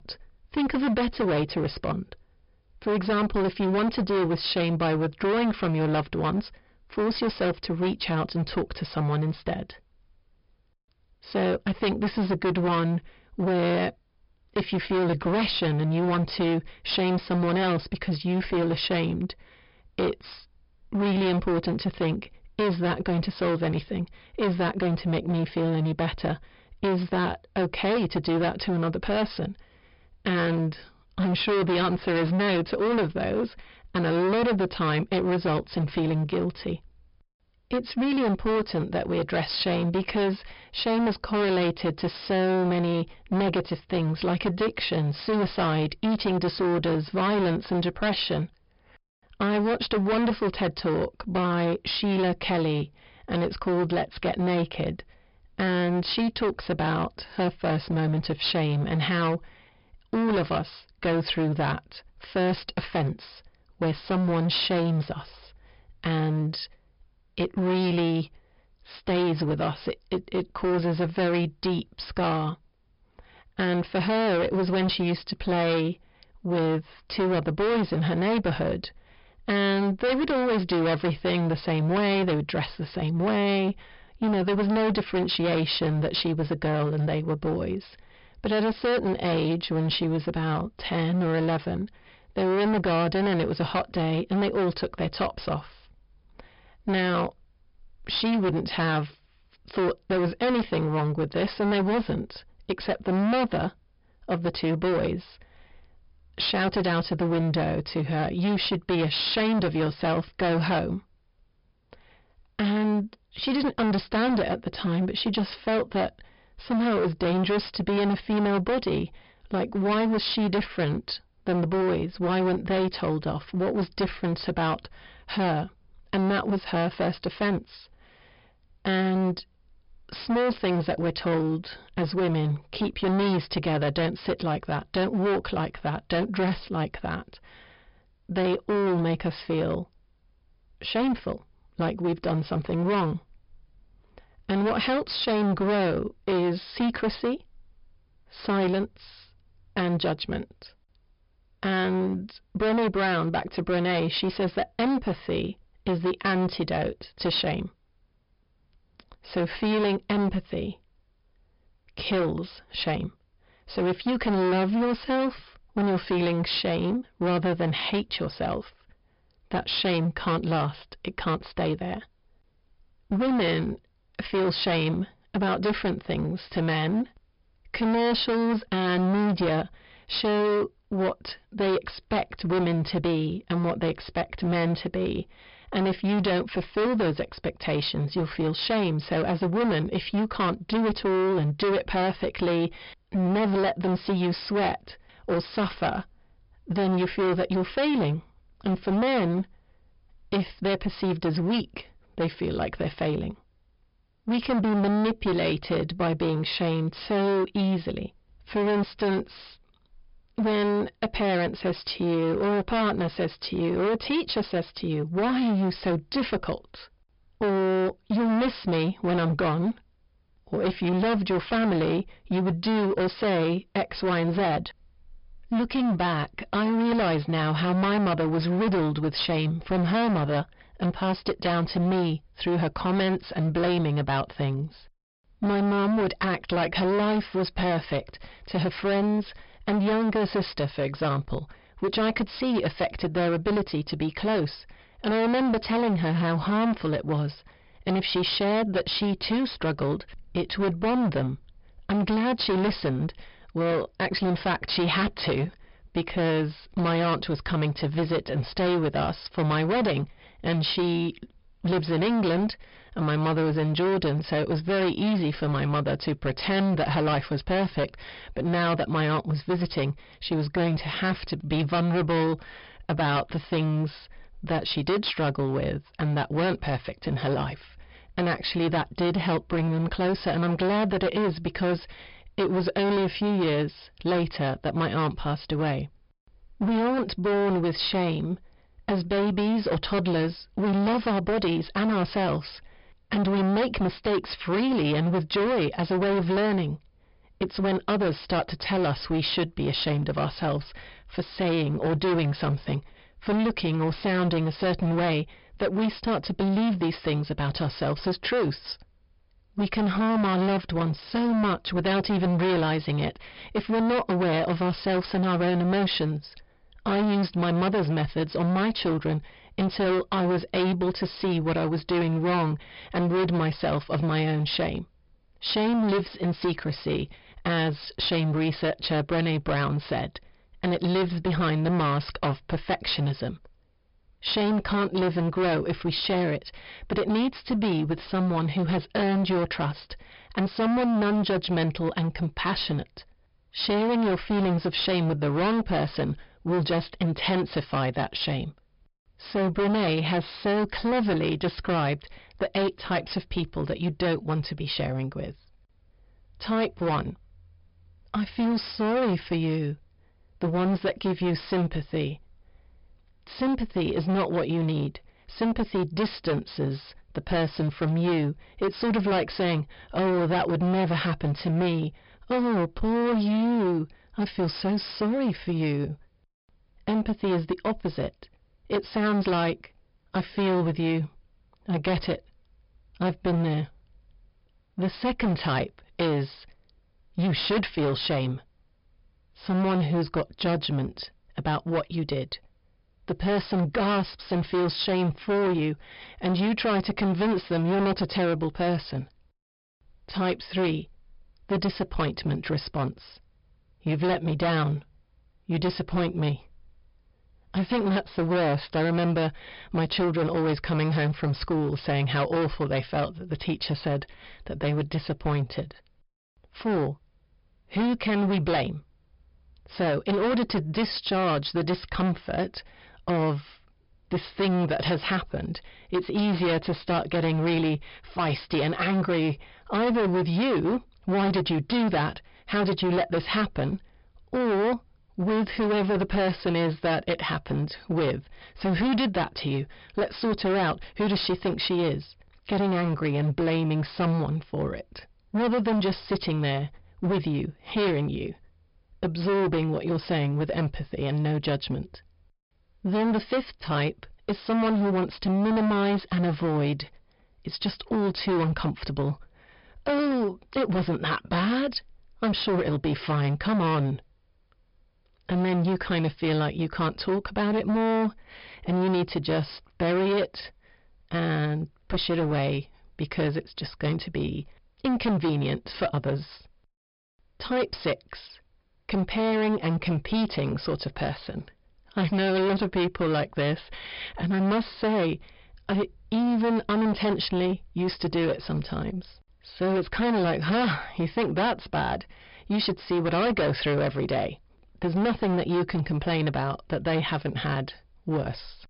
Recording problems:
distortion; heavy; 22% of the sound clipped
high frequencies cut off; noticeable; nothing above 5.5 kHz

